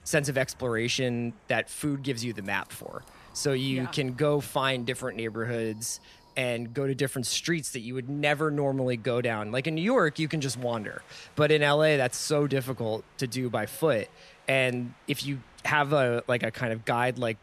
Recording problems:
wind in the background; faint; throughout; 30 dB below the speech

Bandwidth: 14.5 kHz